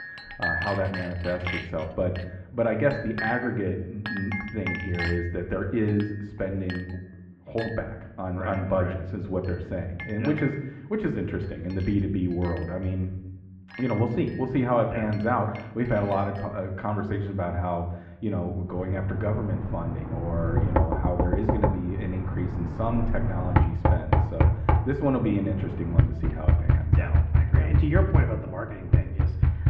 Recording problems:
muffled; very; fading above 2 kHz
room echo; slight; dies away in 0.7 s
off-mic speech; somewhat distant
household noises; very loud; throughout; 2 dB above the speech

